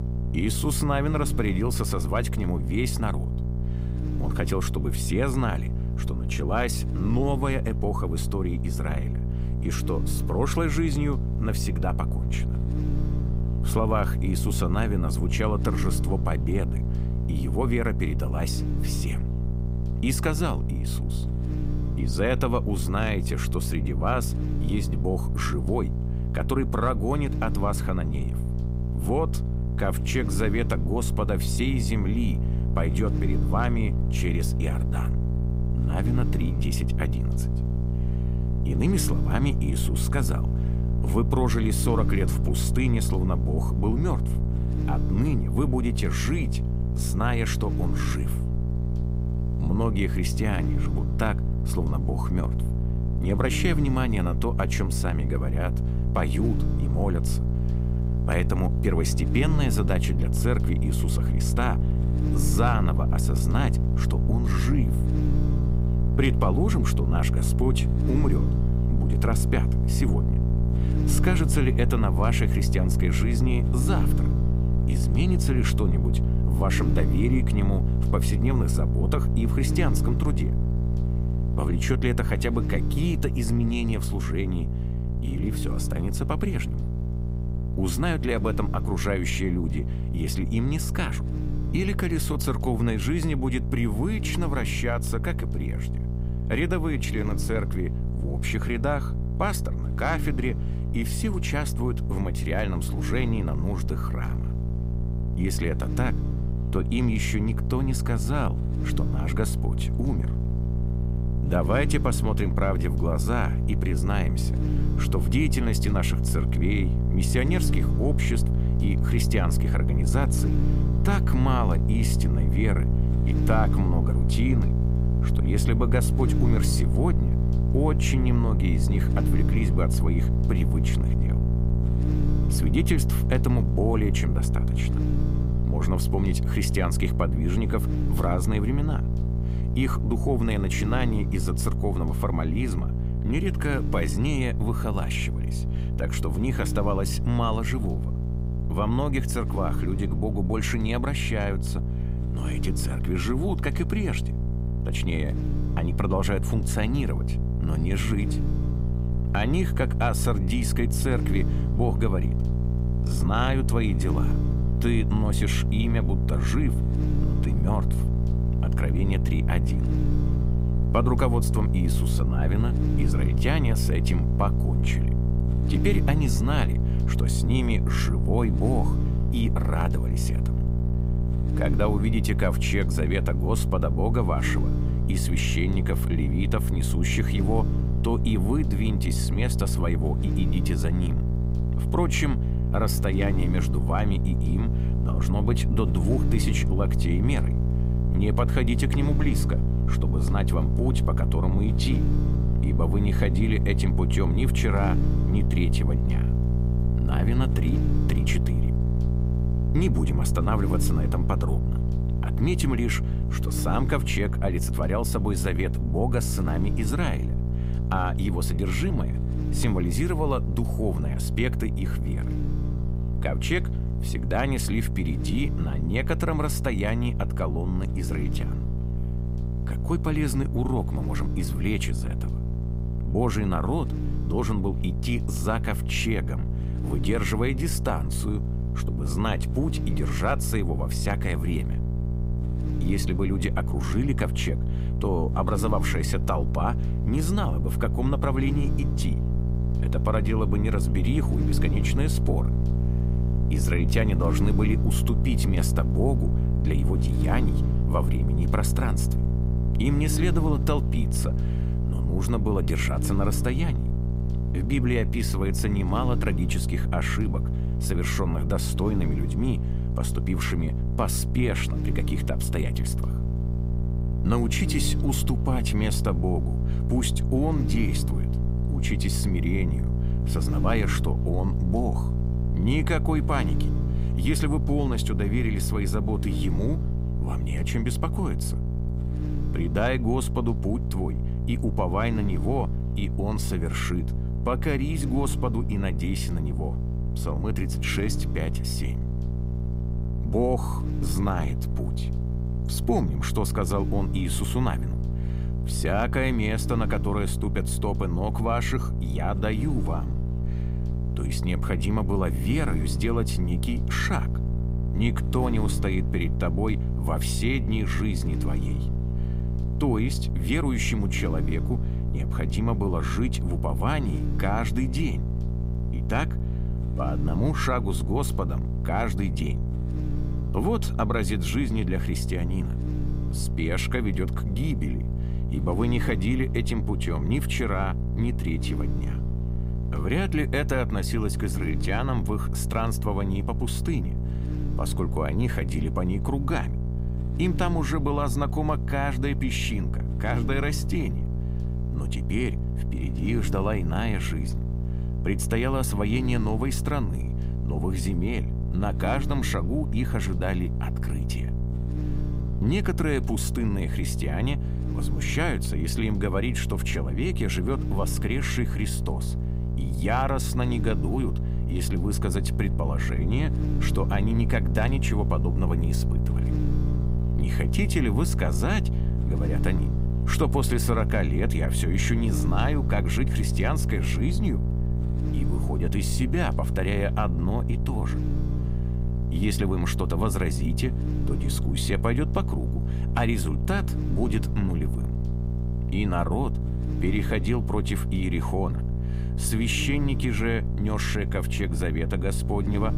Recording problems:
electrical hum; loud; throughout; 60 Hz, 7 dB below the speech

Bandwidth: 15.5 kHz